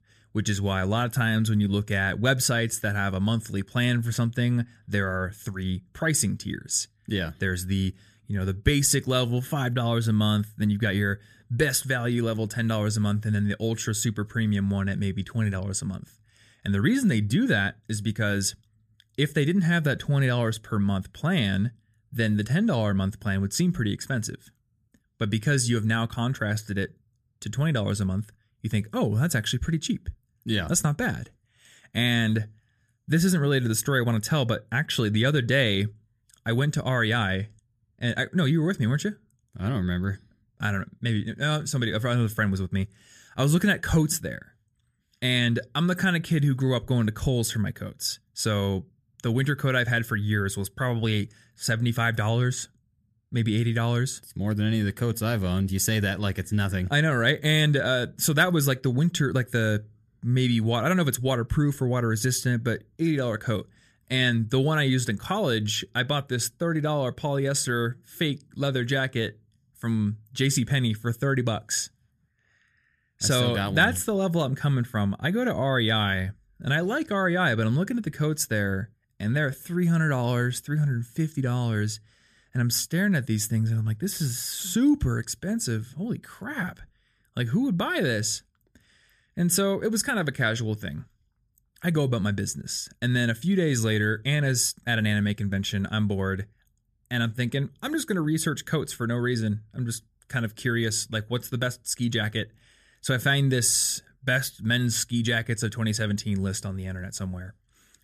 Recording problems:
none

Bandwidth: 14.5 kHz